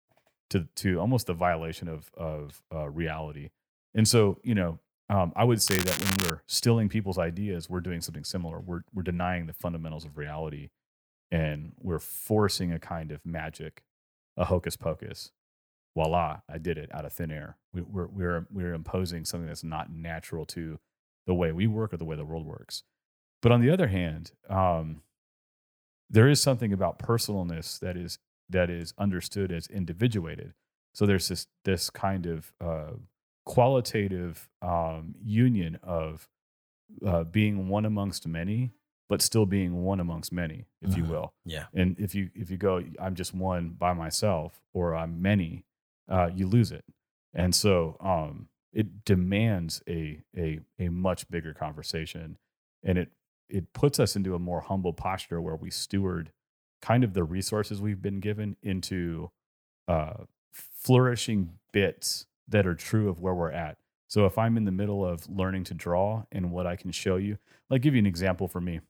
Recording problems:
crackling; loud; at 5.5 s; 1 dB below the speech

